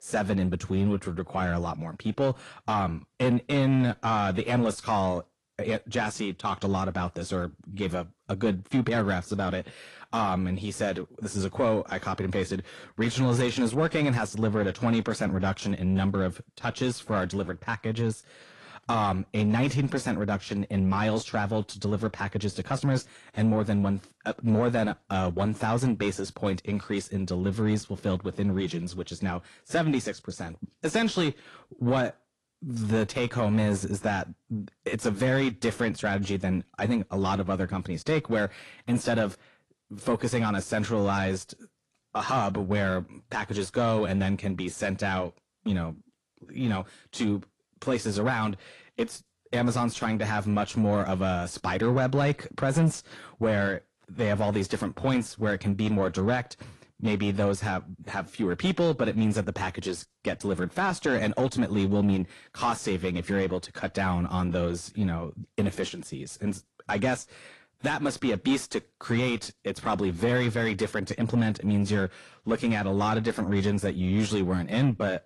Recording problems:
distortion; slight; 10 dB below the speech
garbled, watery; slightly

